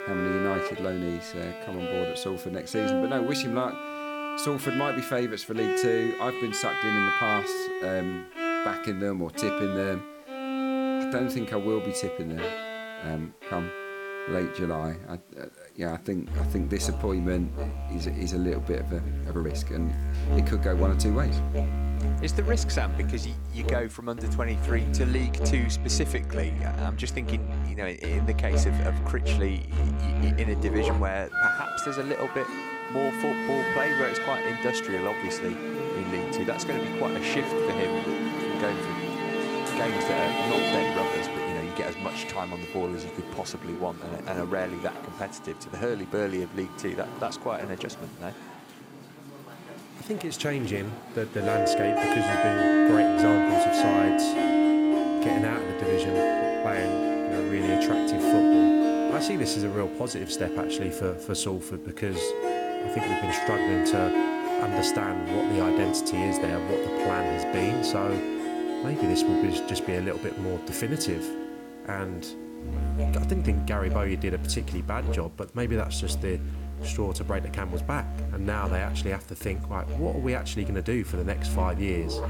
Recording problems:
background music; very loud; throughout; 4 dB above the speech
hiss; faint; until 25 s and from 58 s on; 25 dB below the speech

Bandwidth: 17 kHz